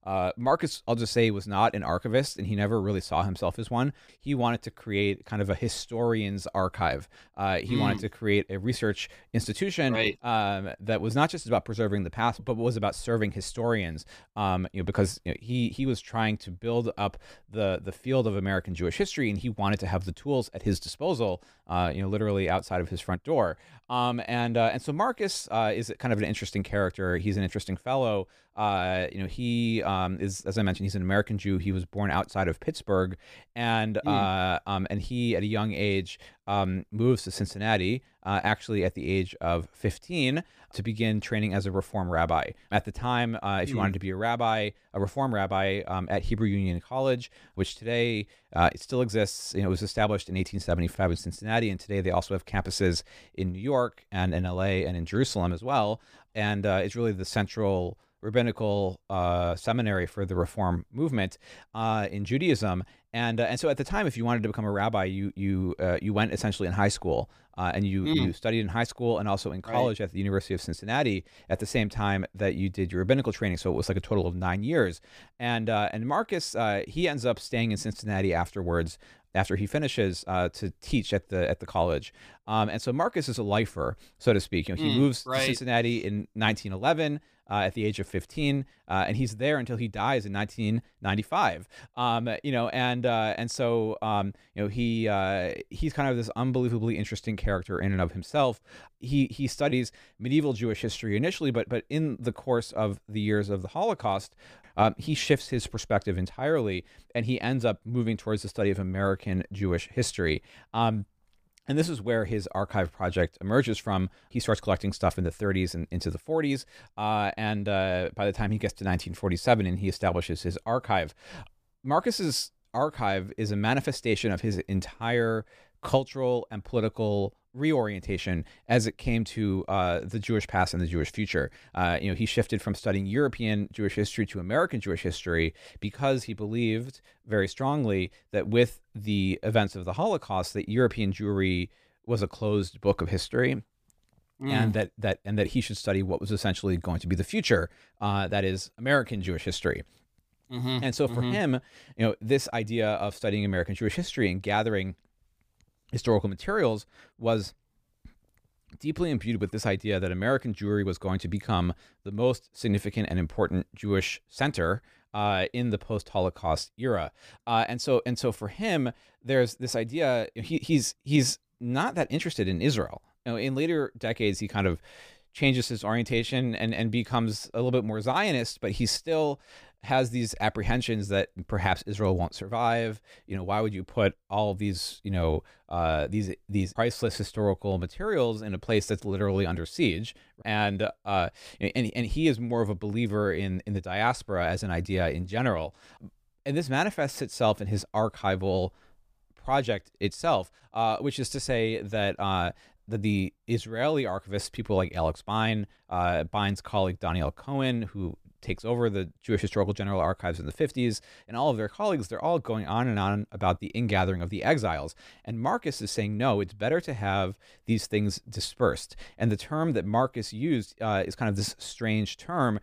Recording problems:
none

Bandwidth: 15 kHz